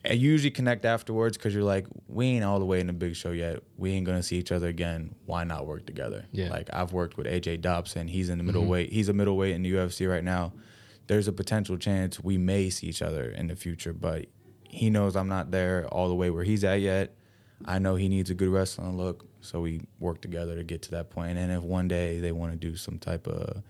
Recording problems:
none

